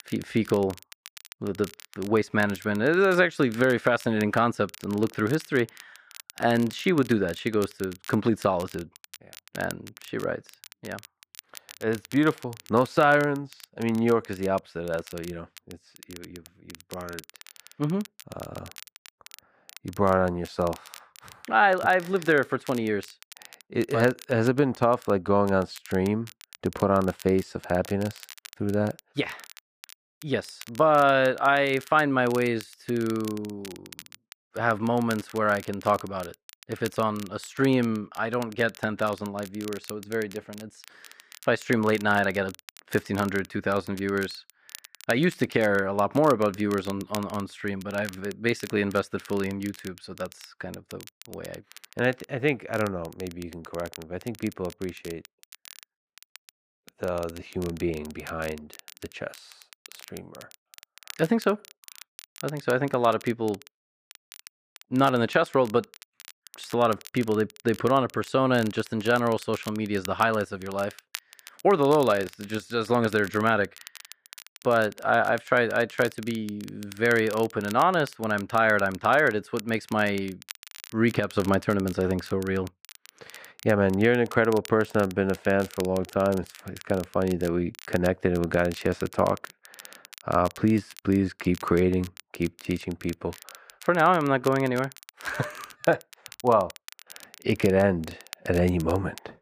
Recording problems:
muffled; slightly; fading above 3.5 kHz
crackle, like an old record; faint; 20 dB below the speech

